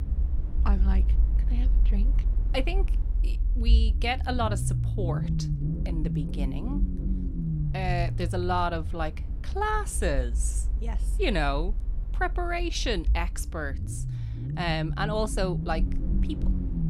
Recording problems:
low rumble; noticeable; throughout; 15 dB below the speech

